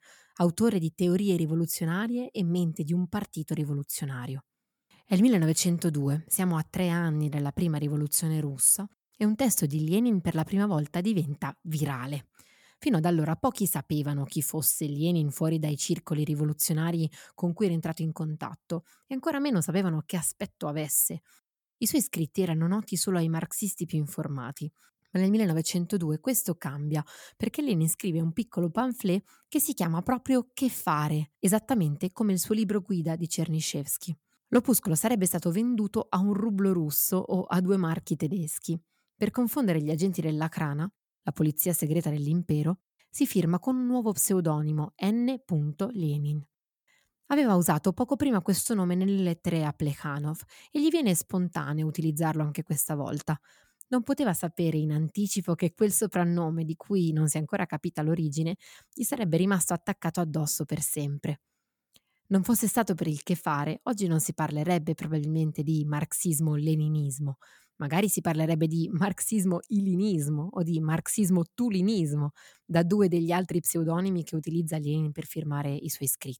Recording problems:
none

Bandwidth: 18.5 kHz